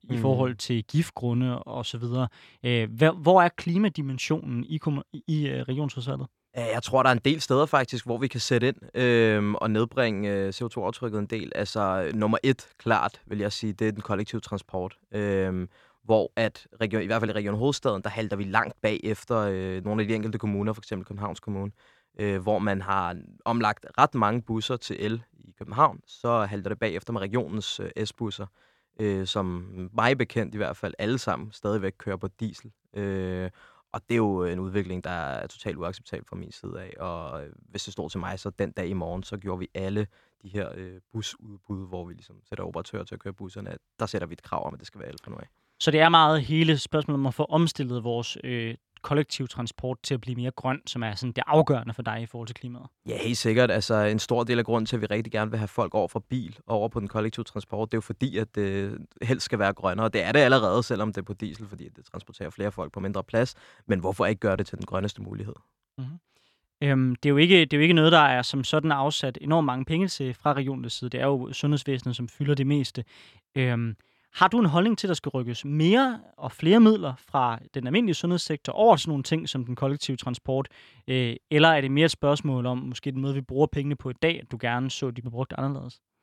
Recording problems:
none

